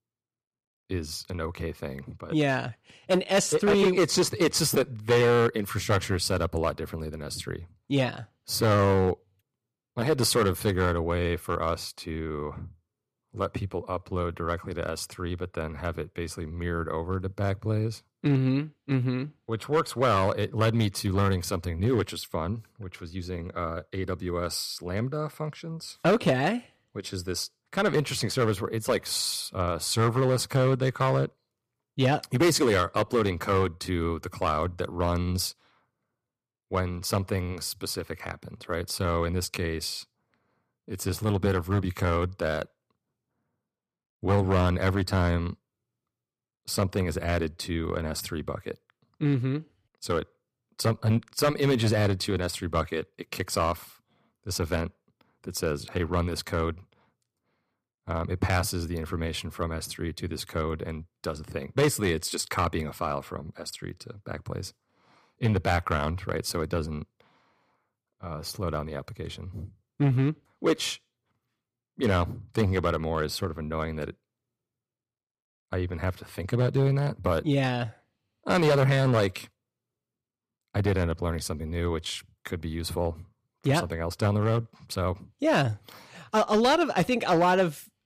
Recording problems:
distortion; slight; 3% of the sound clipped

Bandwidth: 14.5 kHz